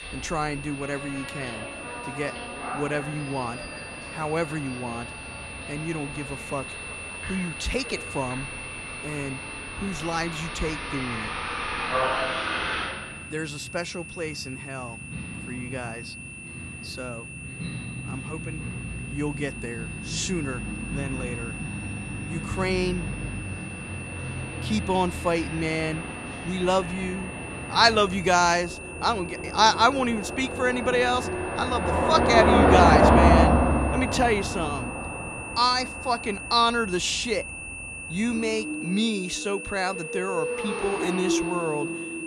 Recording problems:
traffic noise; loud; throughout; 2 dB below the speech
high-pitched whine; noticeable; throughout; 2.5 kHz, 10 dB below the speech

